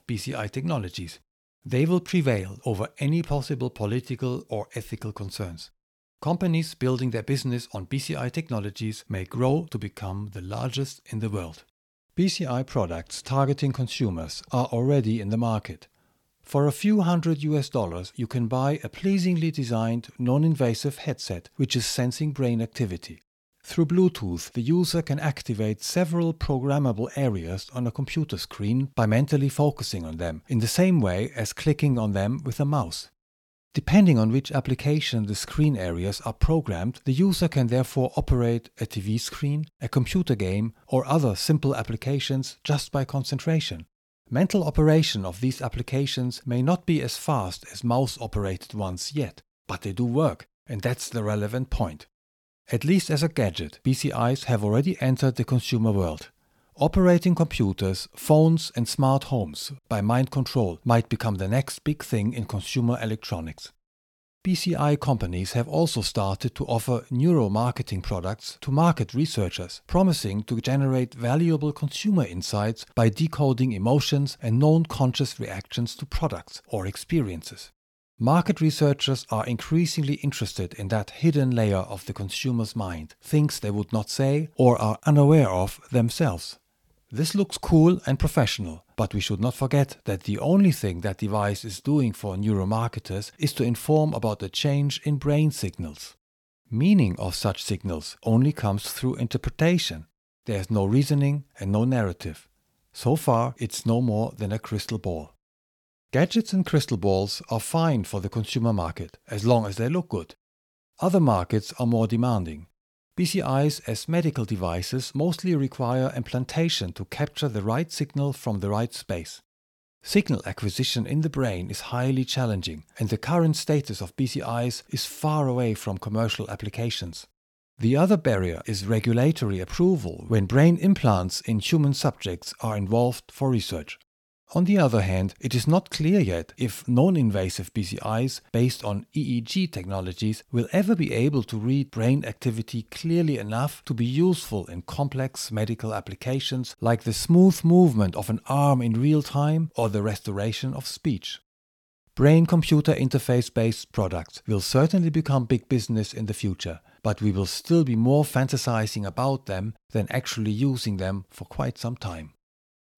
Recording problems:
none

